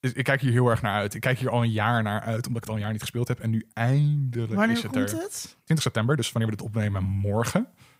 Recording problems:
uneven, jittery; strongly; from 2.5 to 6.5 s

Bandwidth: 15.5 kHz